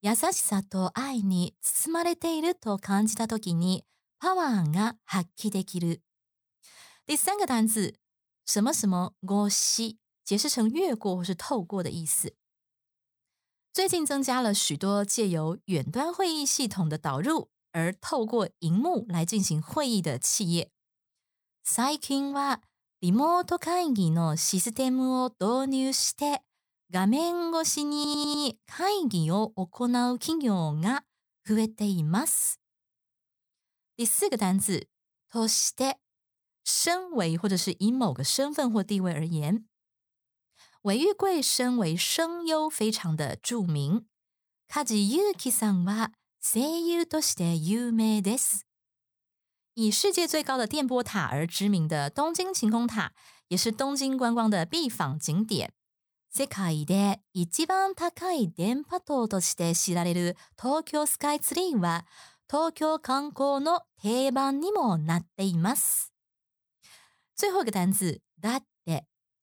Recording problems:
audio stuttering; at 28 s

